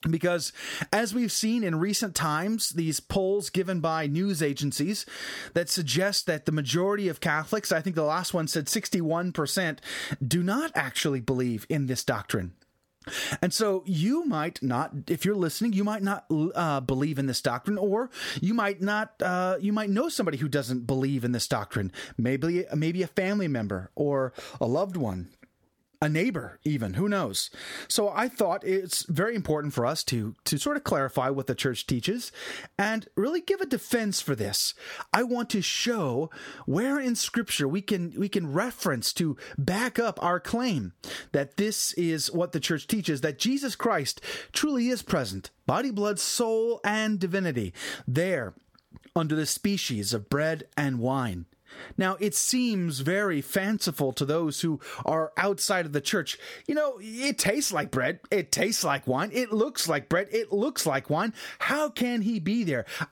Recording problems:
squashed, flat; somewhat

